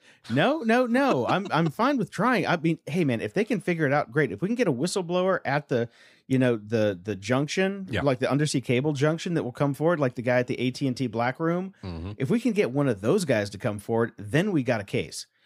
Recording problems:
none

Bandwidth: 15 kHz